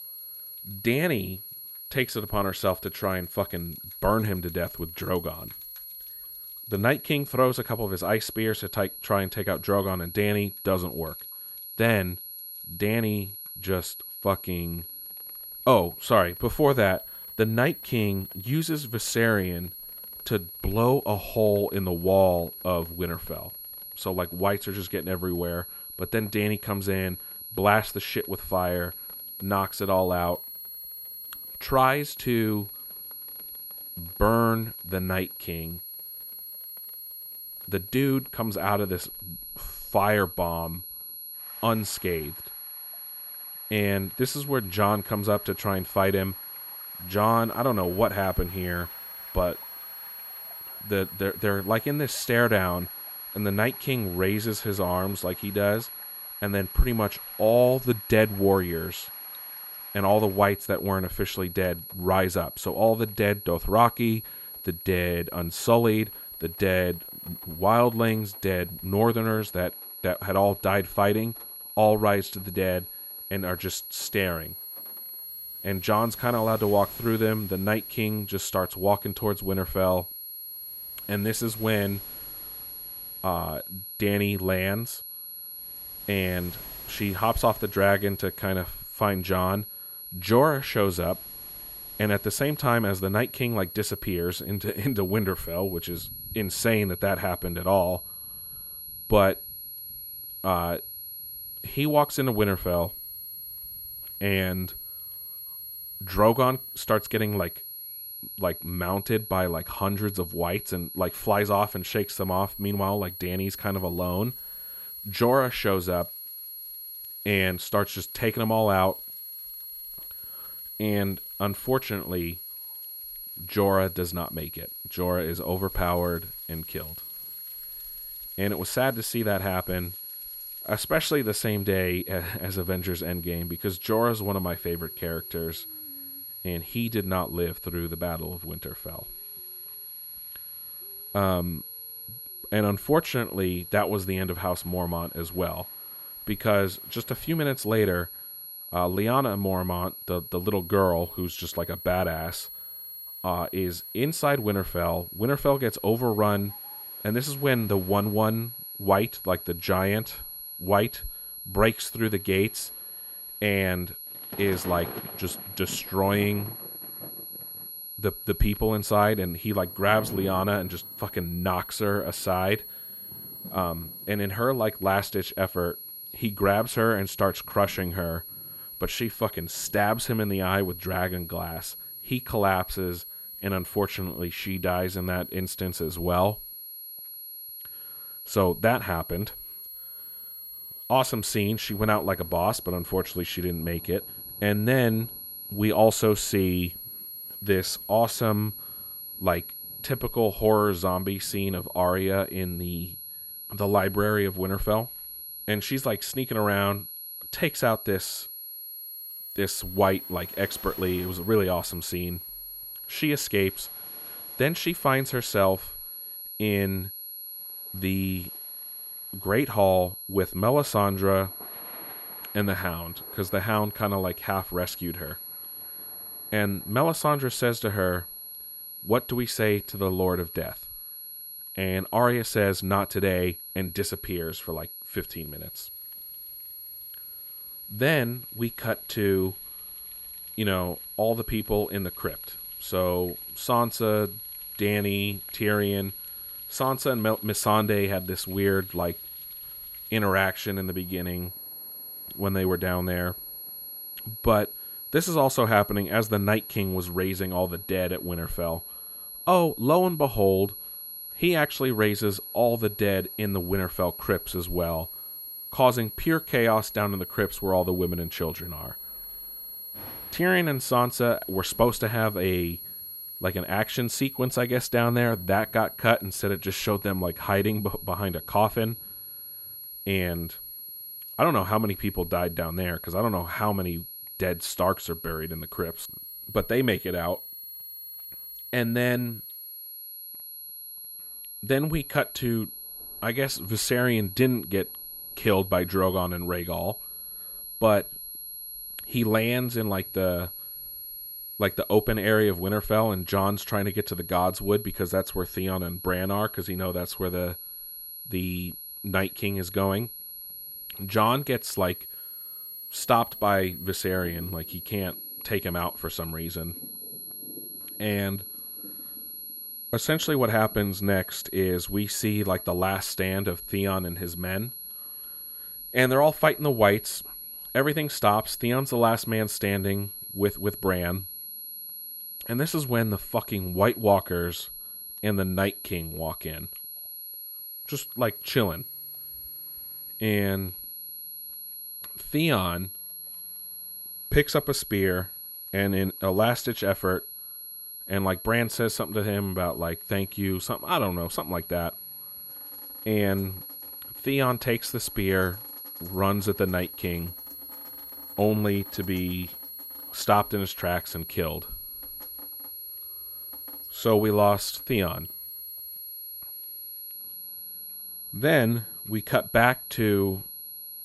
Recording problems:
high-pitched whine; noticeable; throughout; 11.5 kHz, 10 dB below the speech
rain or running water; faint; throughout; 30 dB below the speech

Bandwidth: 15.5 kHz